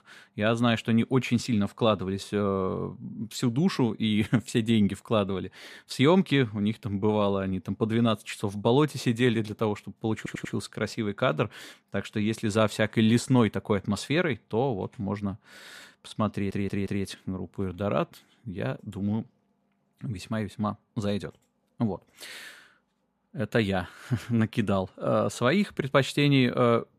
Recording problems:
audio stuttering; at 10 s and at 16 s

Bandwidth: 14.5 kHz